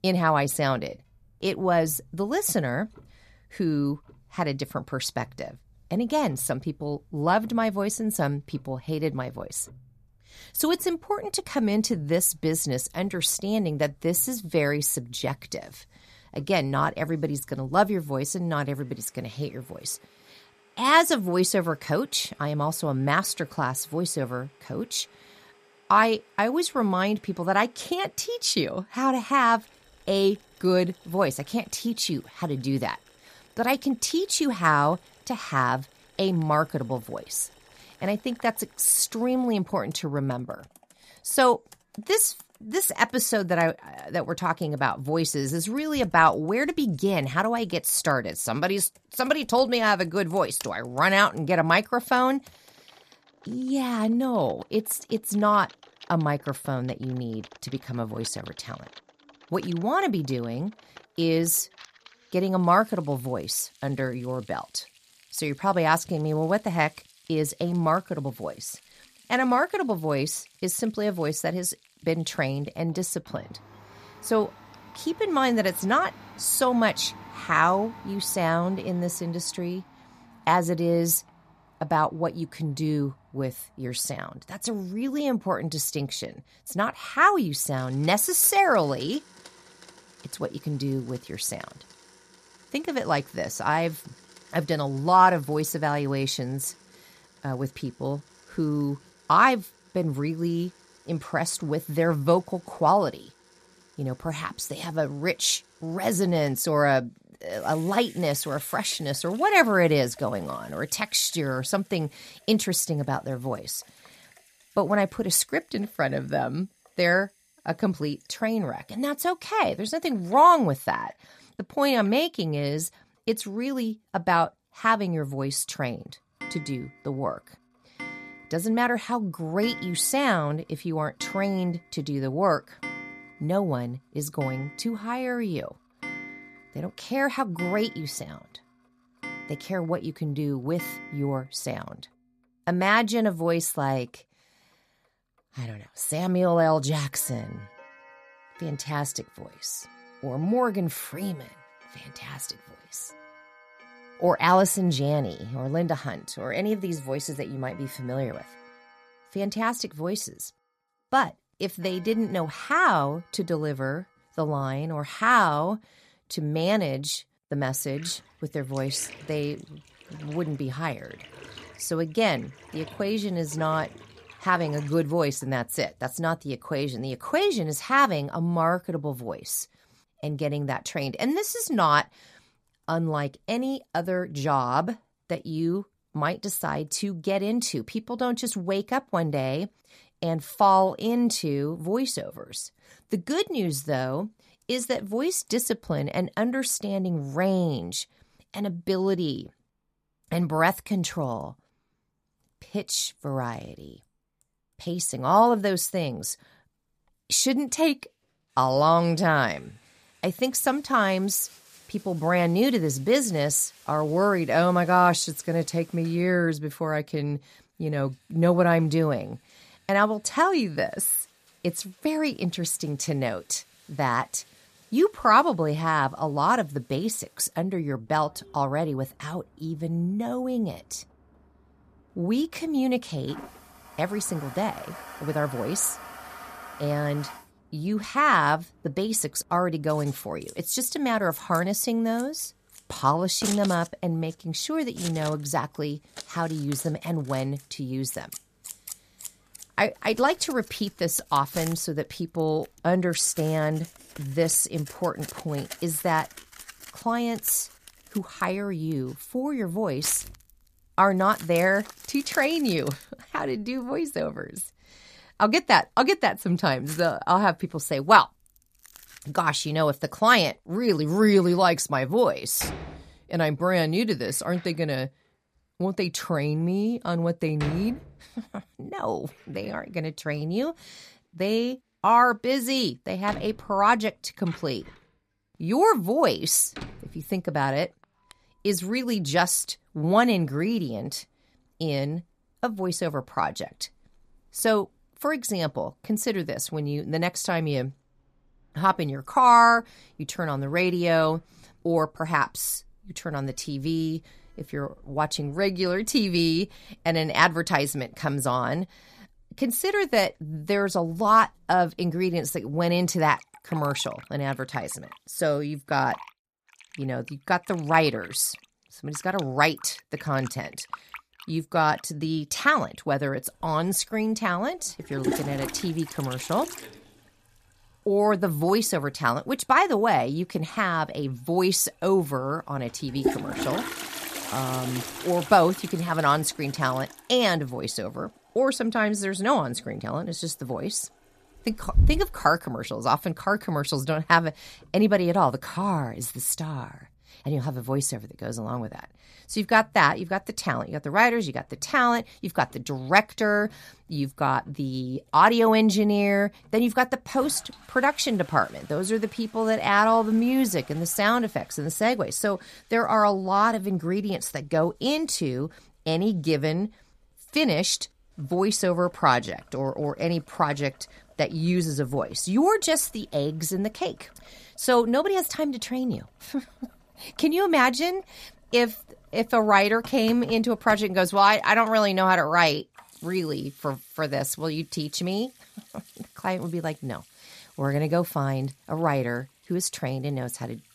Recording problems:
household noises; noticeable; throughout; 20 dB below the speech

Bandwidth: 14.5 kHz